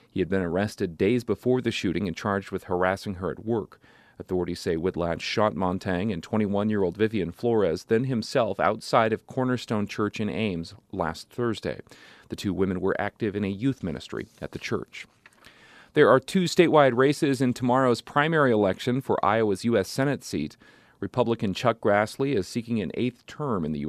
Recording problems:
abrupt cut into speech; at the end

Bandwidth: 14.5 kHz